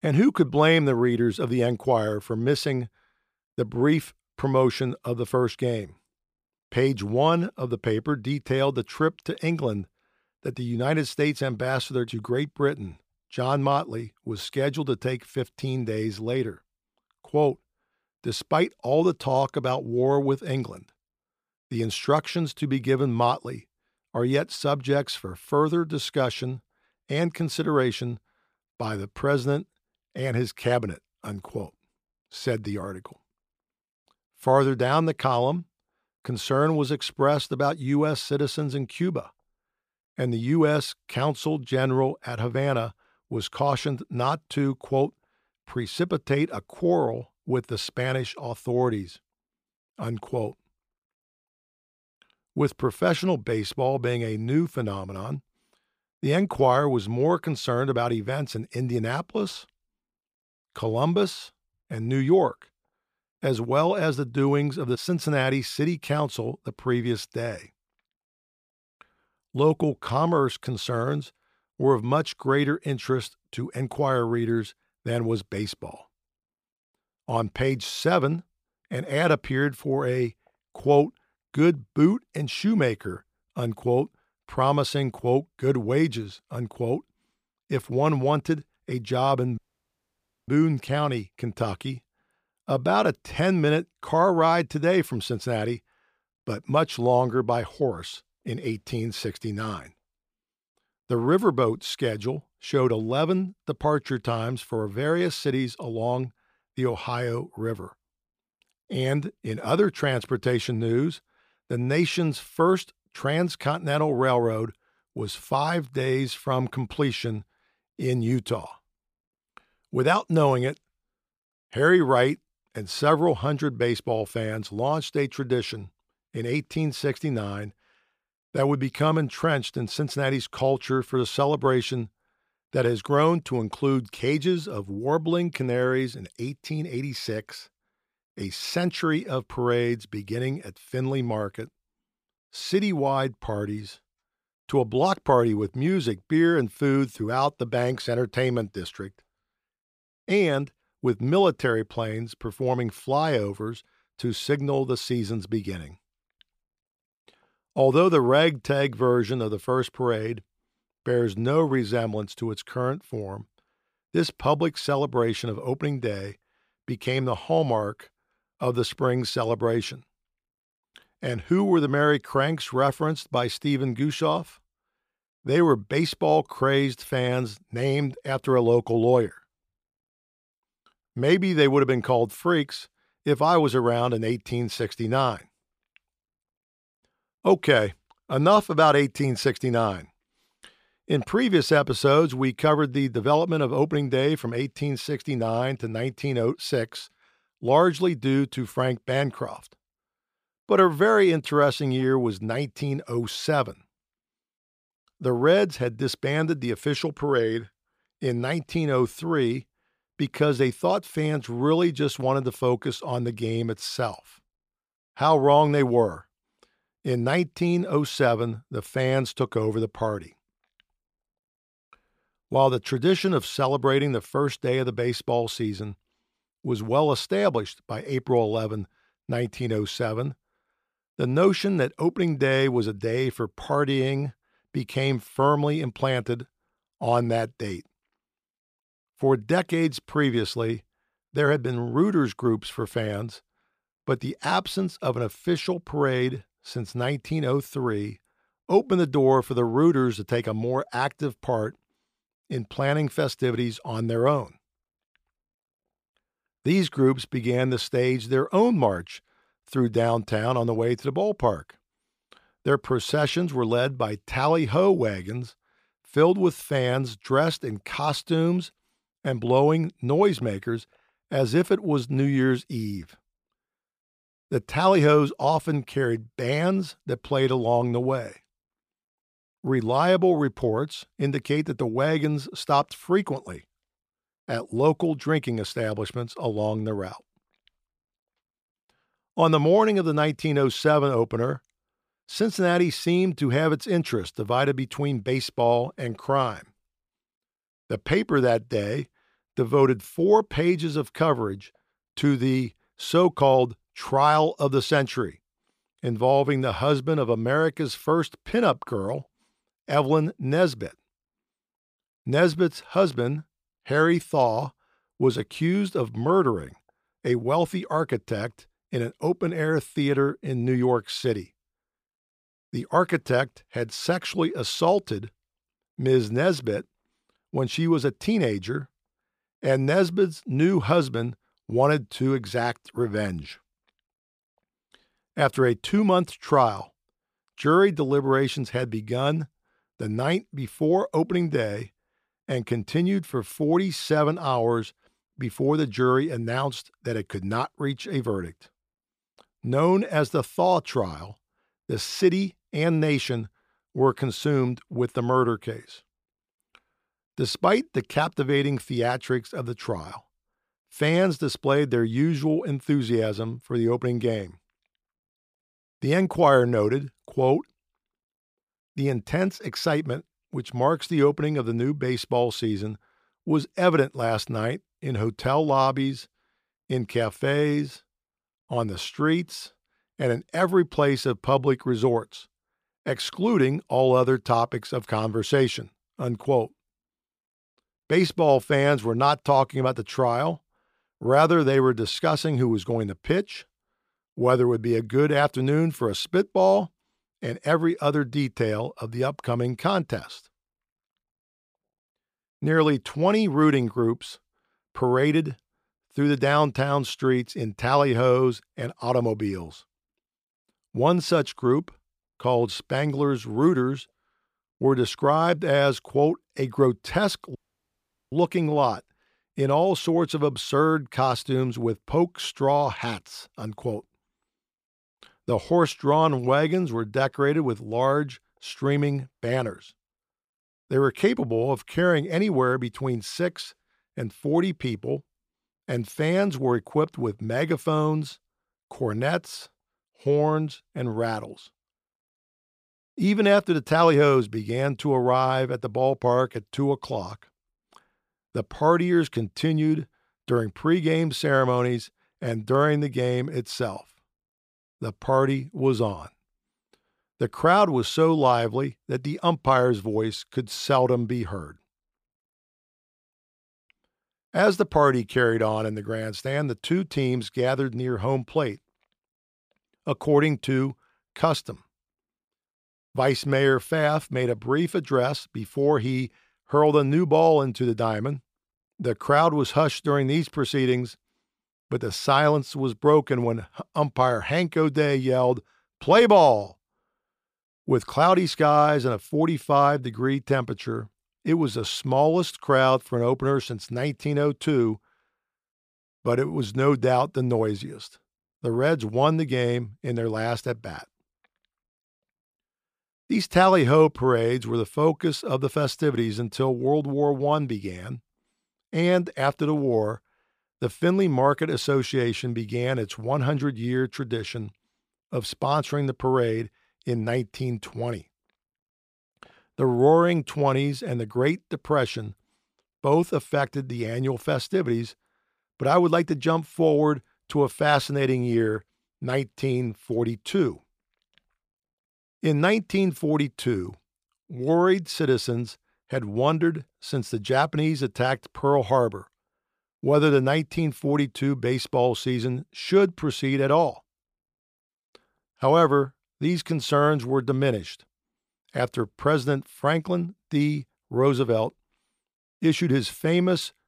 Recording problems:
audio cutting out; at 1:30 for 1 s and at 6:58 for 1 s

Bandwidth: 15 kHz